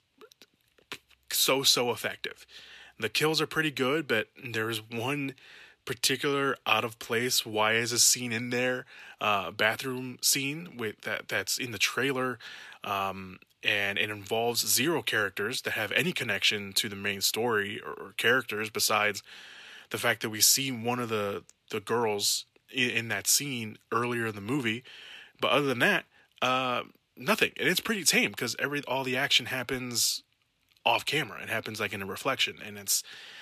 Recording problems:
thin; somewhat; fading below 400 Hz

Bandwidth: 14 kHz